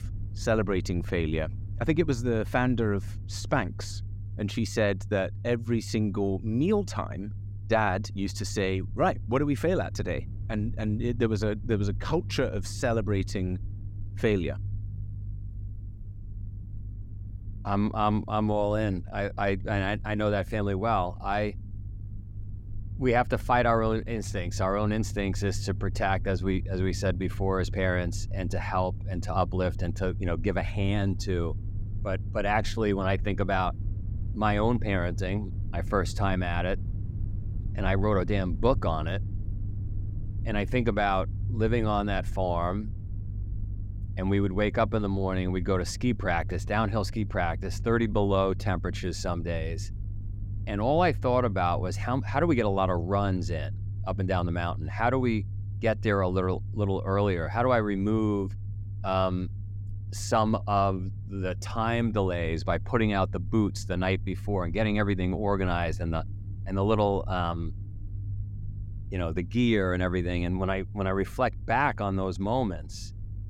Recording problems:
low rumble; faint; throughout; 20 dB below the speech

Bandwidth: 16 kHz